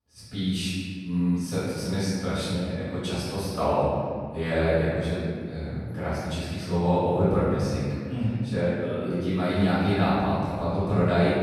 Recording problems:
room echo; strong; dies away in 2 s
off-mic speech; far

